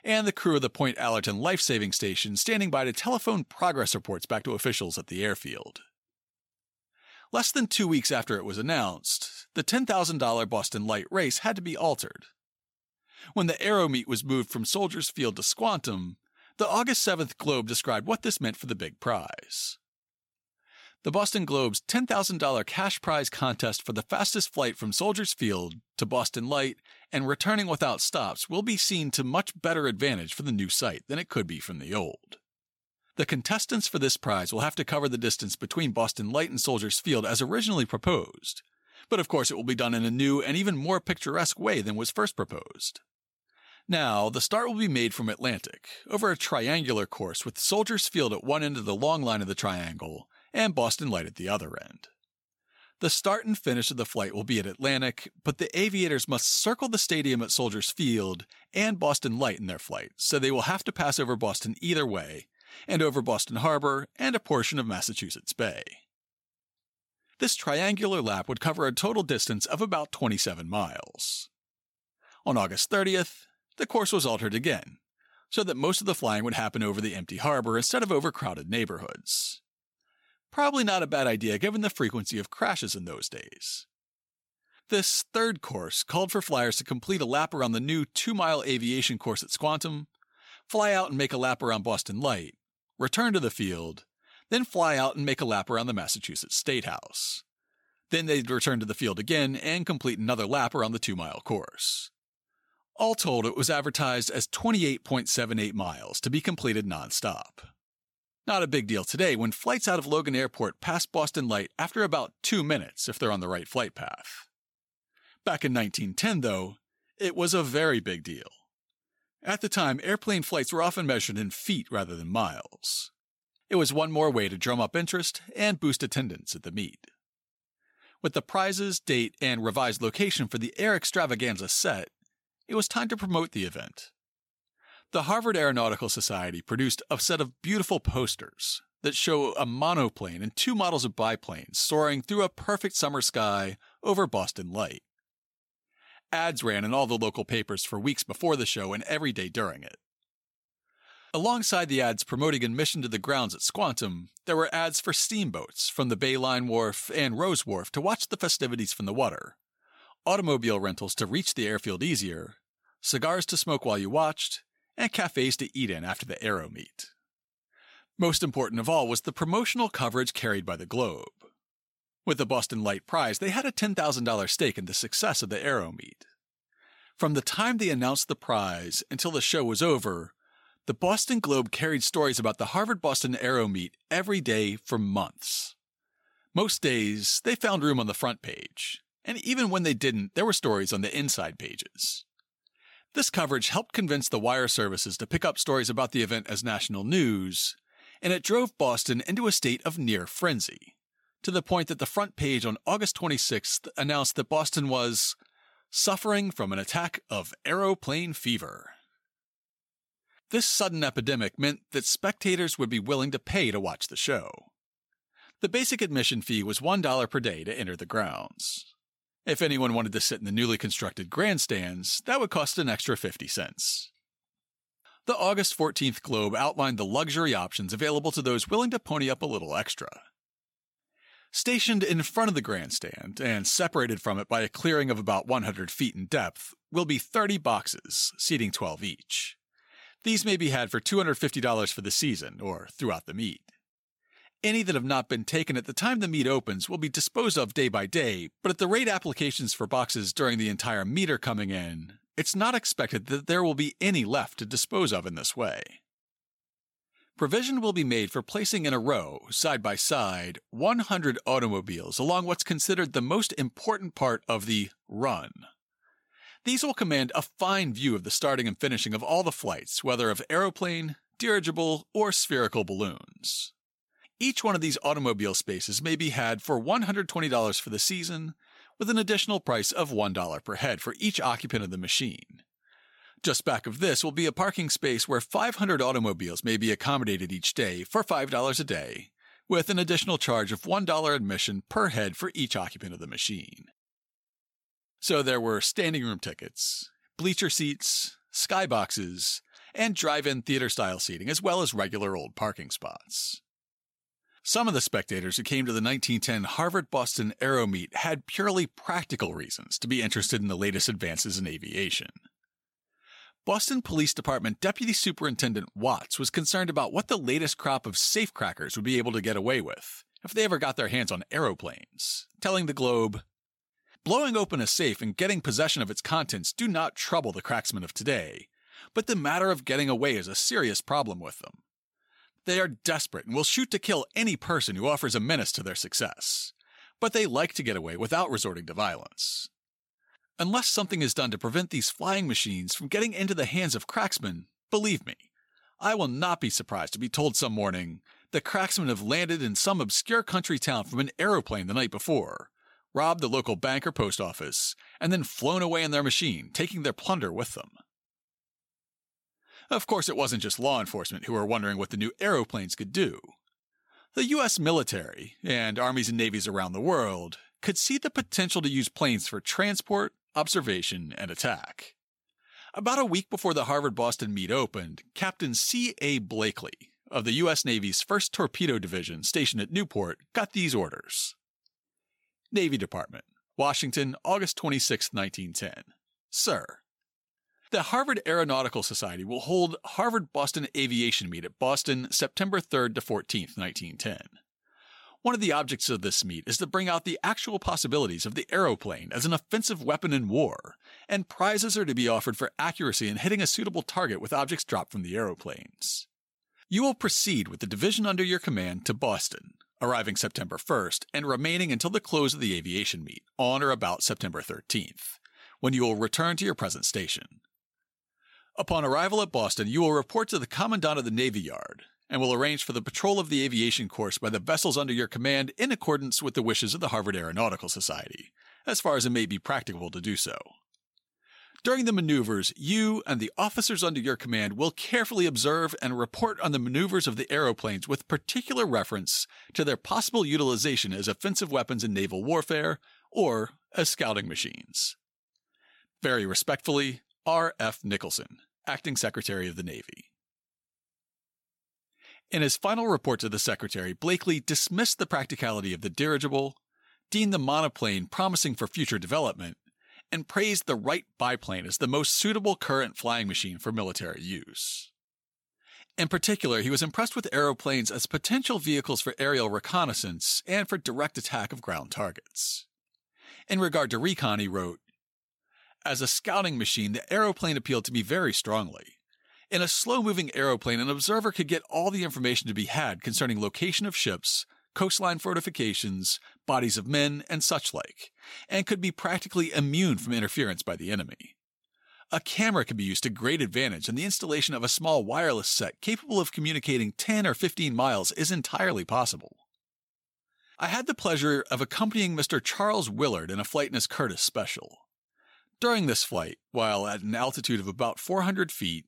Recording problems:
none

